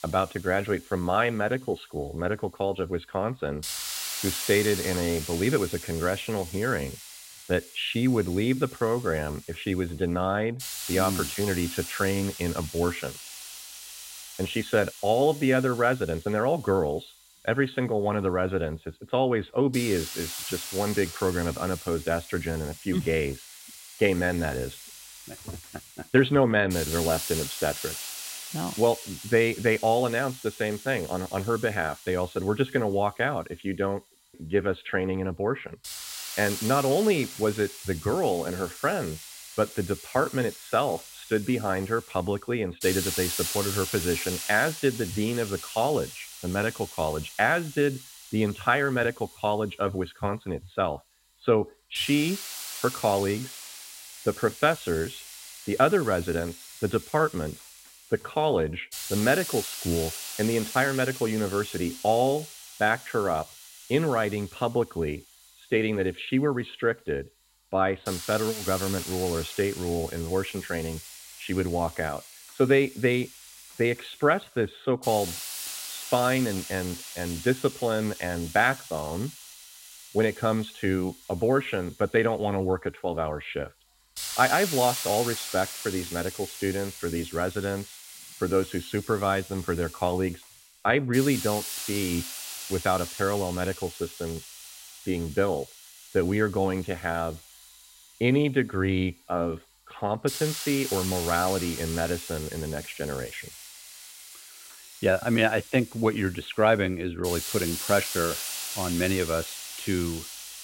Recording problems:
high frequencies cut off; severe; nothing above 4 kHz
hiss; loud; throughout; 9 dB below the speech

